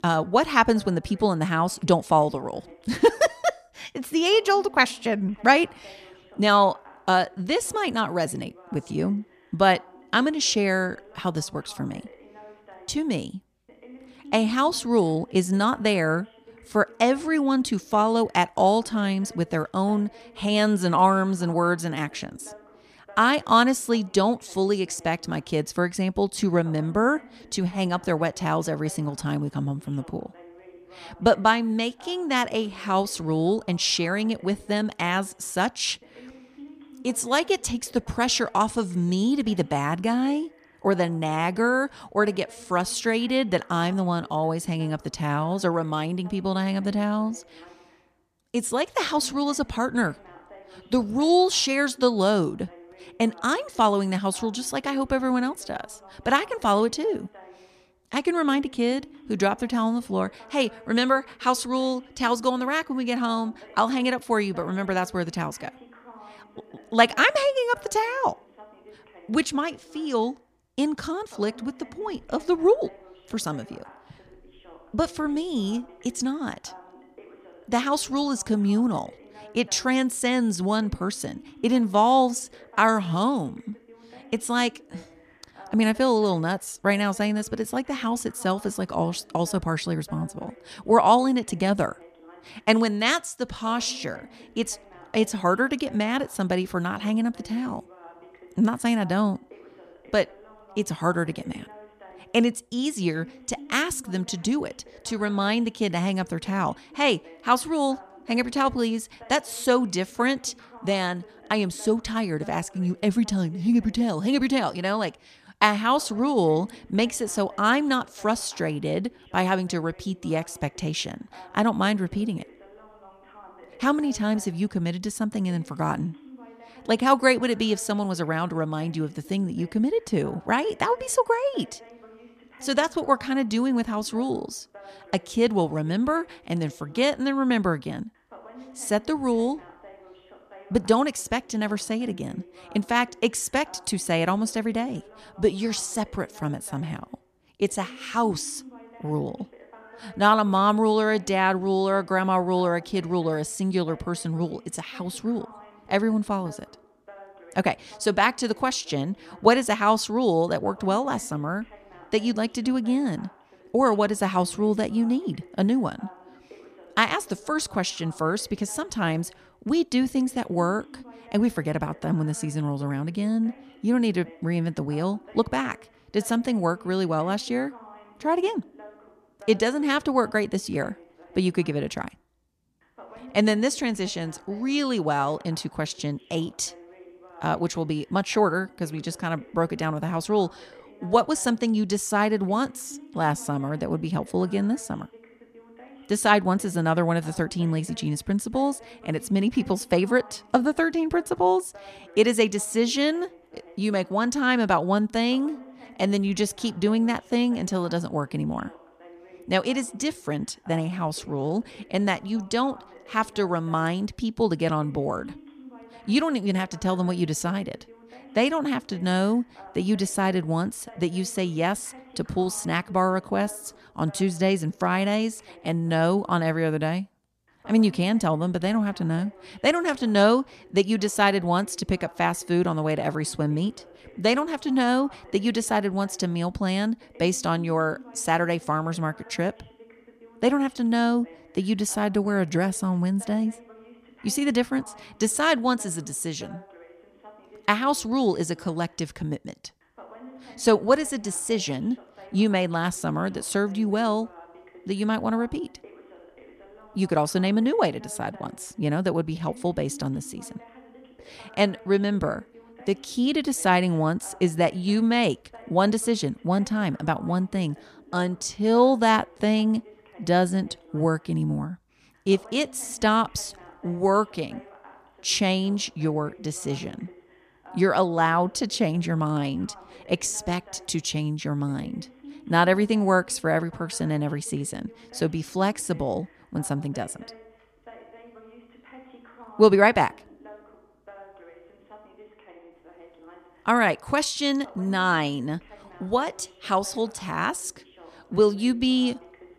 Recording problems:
voice in the background; faint; throughout; 25 dB below the speech

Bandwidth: 14.5 kHz